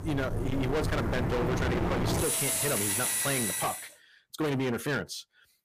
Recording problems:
distortion; heavy; 32% of the sound clipped
machinery noise; very loud; until 3.5 s; 2 dB above the speech

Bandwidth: 15 kHz